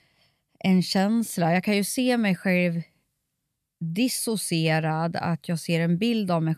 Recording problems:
none

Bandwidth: 14.5 kHz